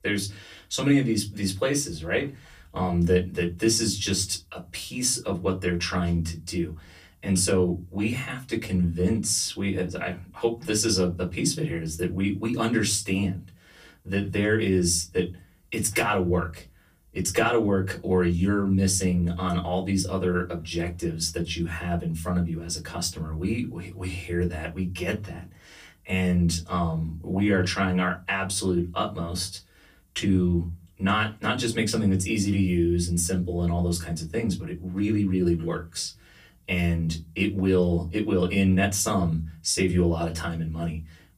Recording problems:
off-mic speech; far
room echo; very slight; dies away in 0.3 s

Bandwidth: 15 kHz